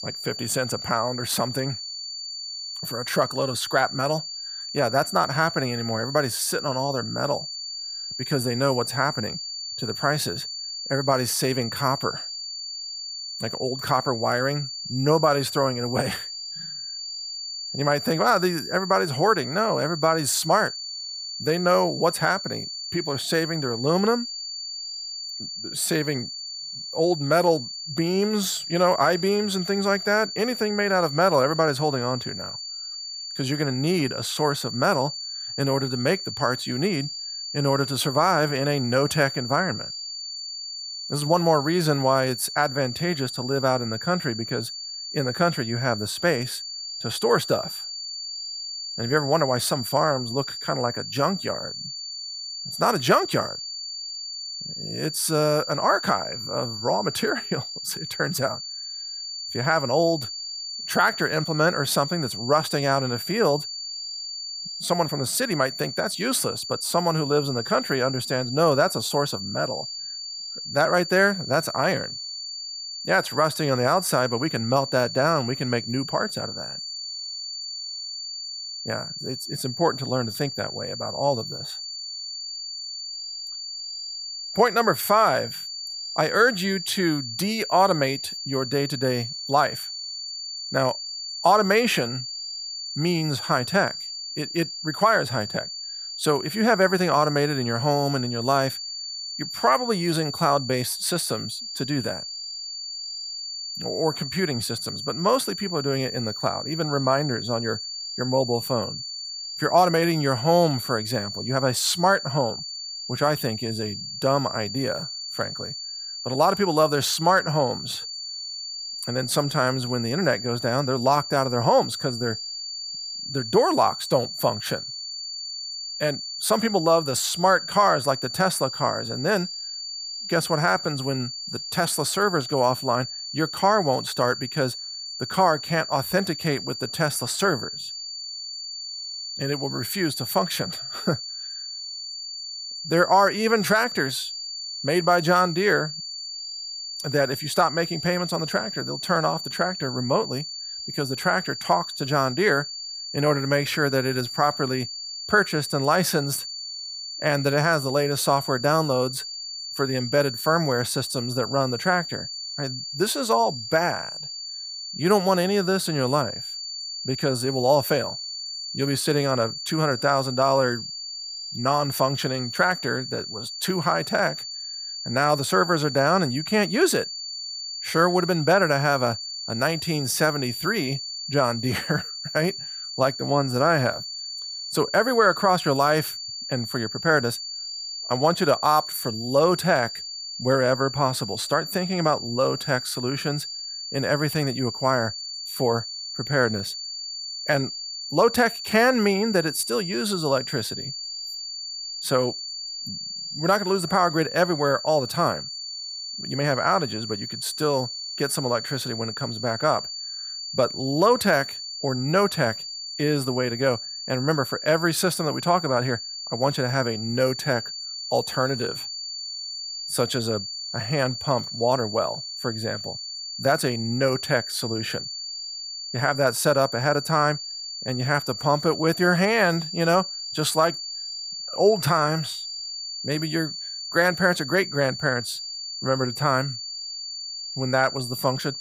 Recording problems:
high-pitched whine; loud; throughout; 4.5 kHz, 7 dB below the speech

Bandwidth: 15 kHz